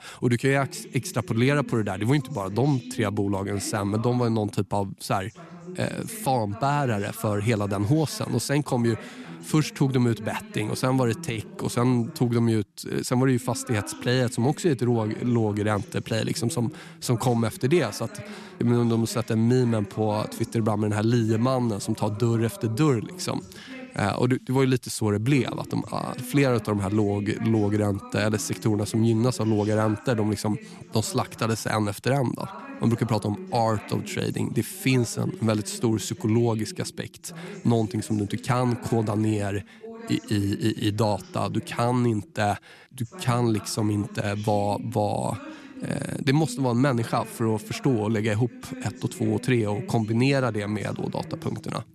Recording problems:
voice in the background; noticeable; throughout; 15 dB below the speech

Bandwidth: 13.5 kHz